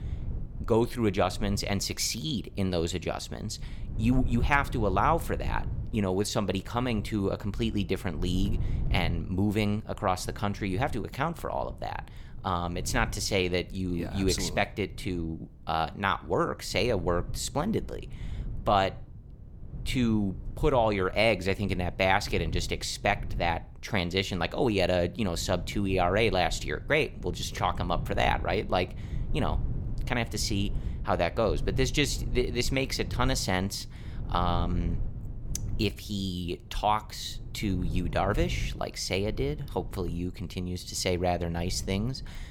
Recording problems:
low rumble; faint; throughout; 20 dB below the speech

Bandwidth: 17 kHz